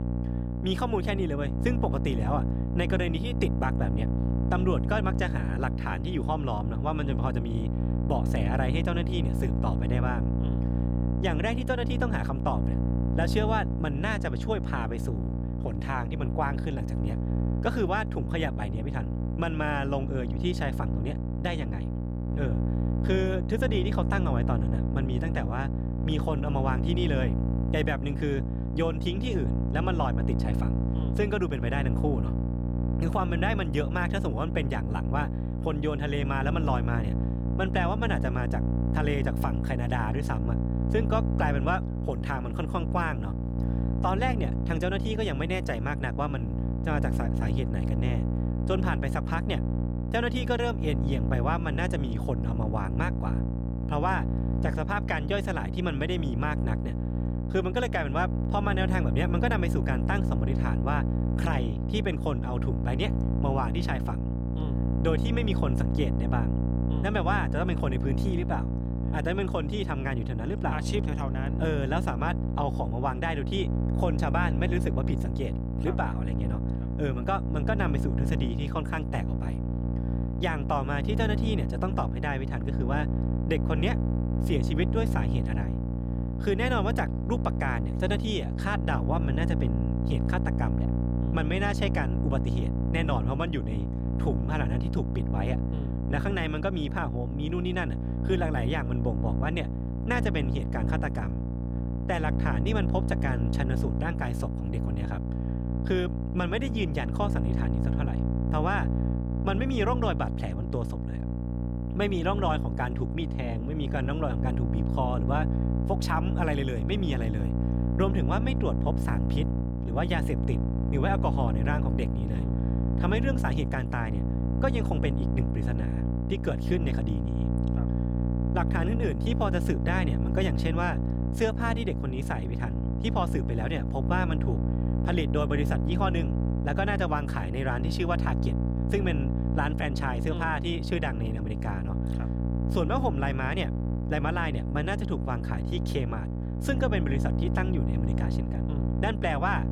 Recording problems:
electrical hum; loud; throughout; 60 Hz, 6 dB below the speech

